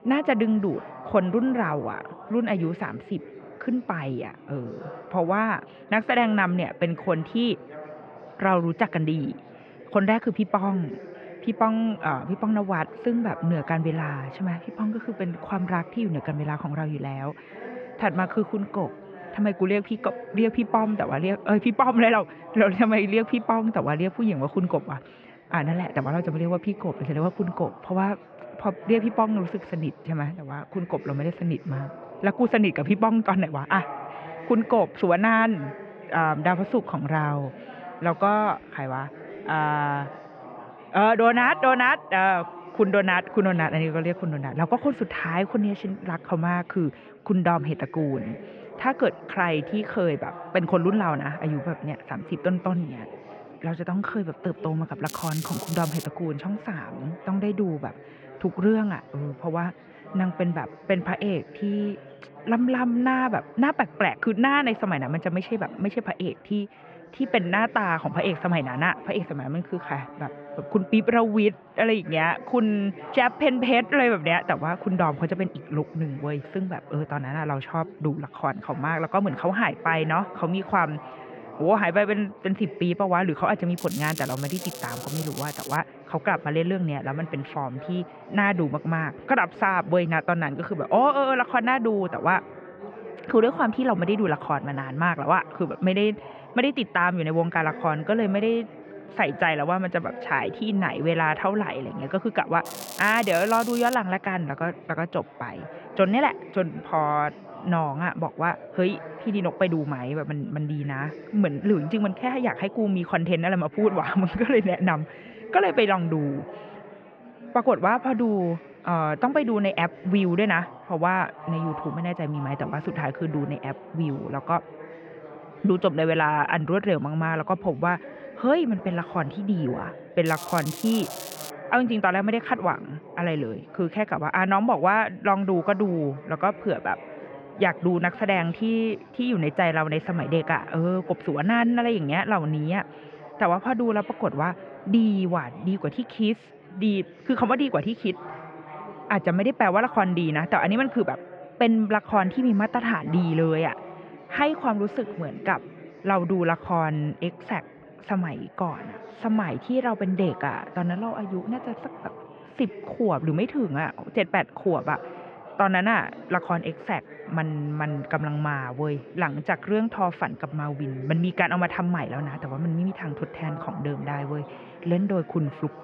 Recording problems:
muffled; very; fading above 2.5 kHz
chatter from many people; noticeable; throughout; 15 dB below the speech
crackling; noticeable; 4 times, first at 55 s; 10 dB below the speech

